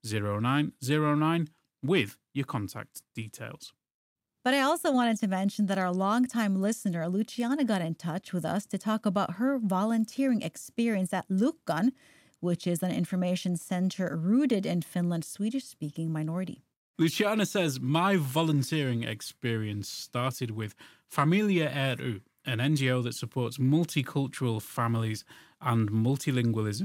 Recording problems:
abrupt cut into speech; at the end

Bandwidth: 16 kHz